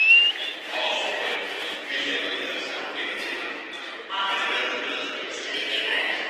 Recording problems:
room echo; strong; dies away in 3 s
off-mic speech; far
thin; very; fading below 300 Hz
echo of what is said; faint; throughout; 400 ms later, 20 dB below the speech
garbled, watery; slightly; nothing above 14.5 kHz
murmuring crowd; very loud; throughout; 1 dB above the speech

